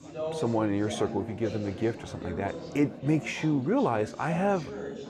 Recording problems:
chatter from many people; loud; throughout; 9 dB below the speech

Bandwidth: 15 kHz